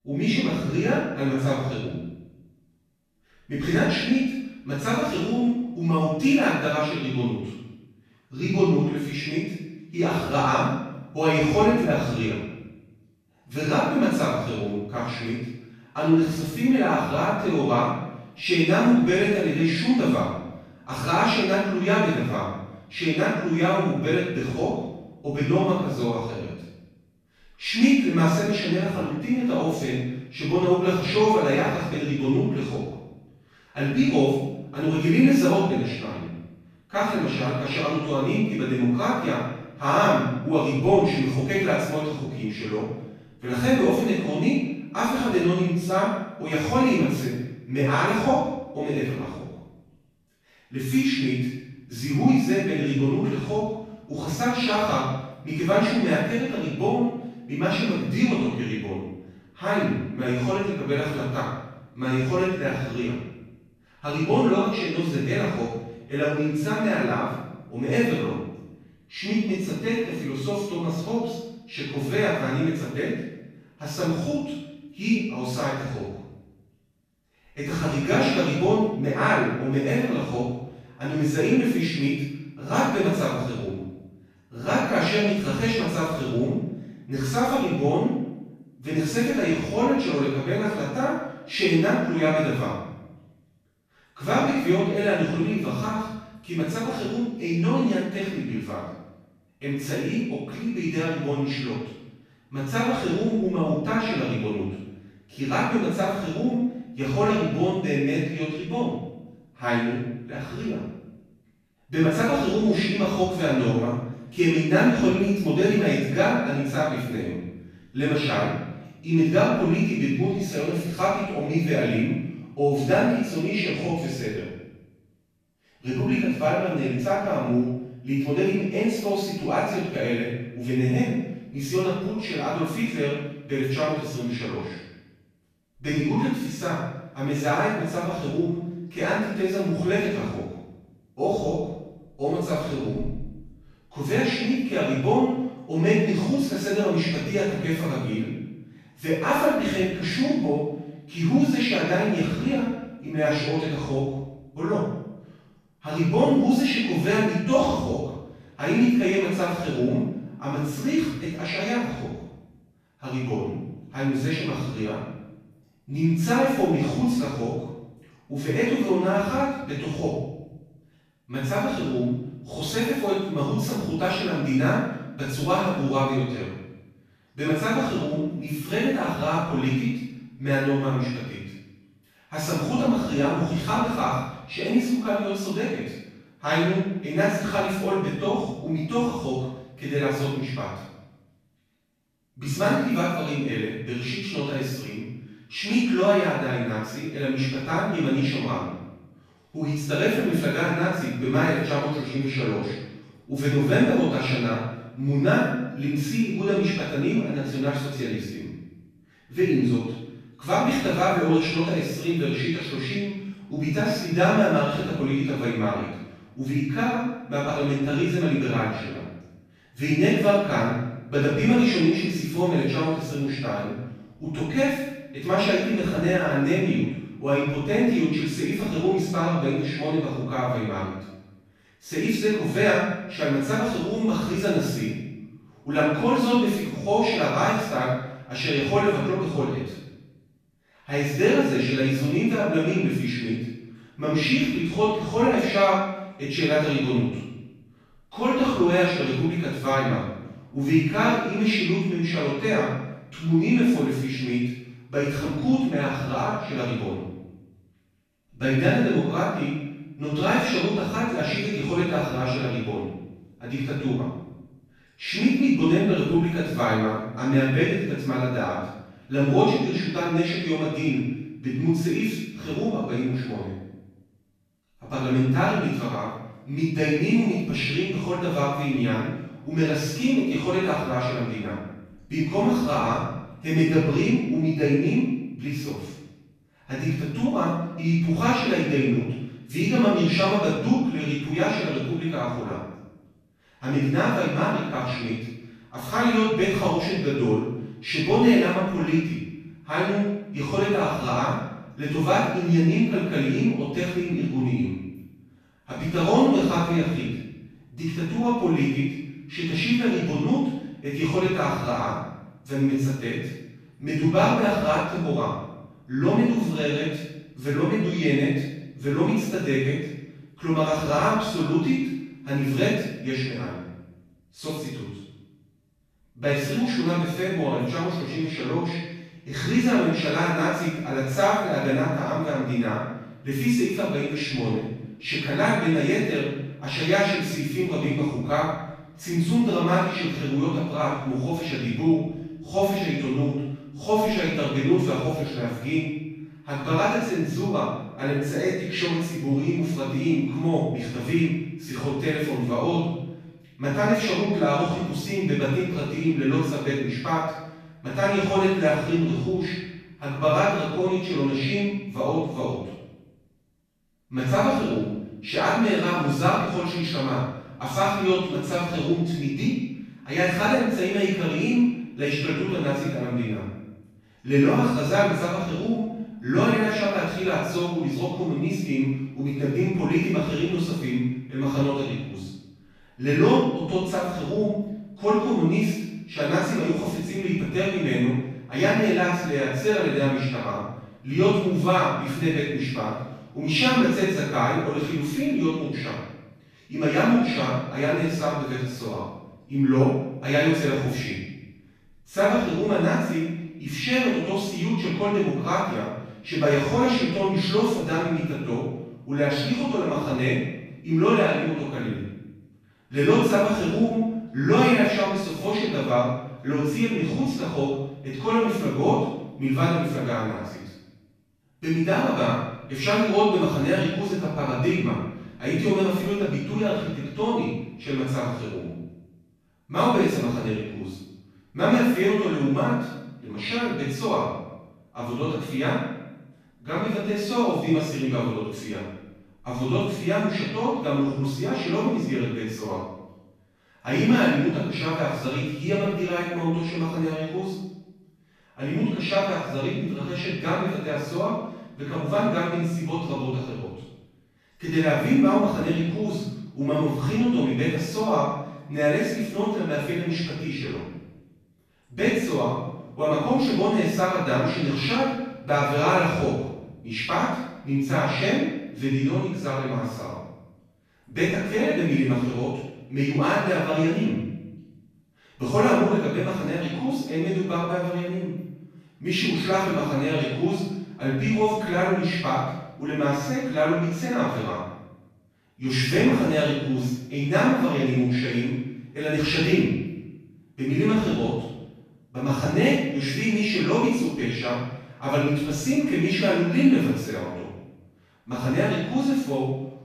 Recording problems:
room echo; strong; dies away in 0.8 s
off-mic speech; far

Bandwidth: 14.5 kHz